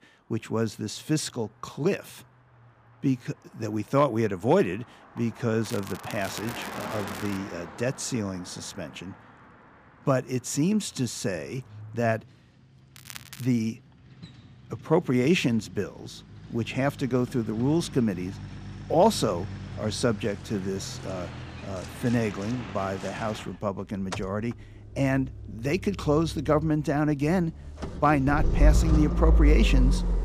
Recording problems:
traffic noise; loud; throughout; 5 dB below the speech
crackling; noticeable; from 5.5 to 7.5 s and at 13 s; 15 dB below the speech

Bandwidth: 15 kHz